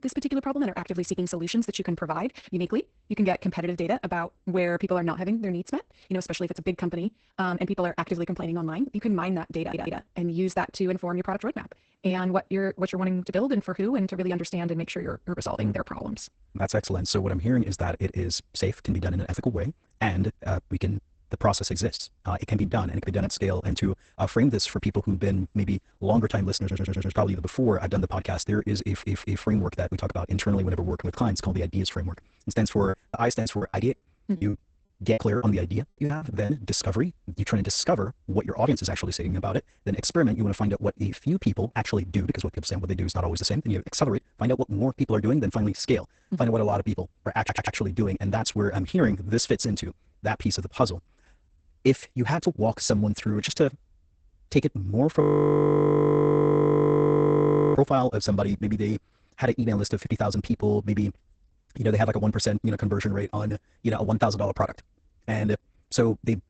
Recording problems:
garbled, watery; badly; nothing above 8 kHz
wrong speed, natural pitch; too fast; 1.5 times normal speed
audio stuttering; 4 times, first at 9.5 s
choppy; very; from 33 to 36 s; 16% of the speech affected
audio freezing; at 55 s for 2.5 s

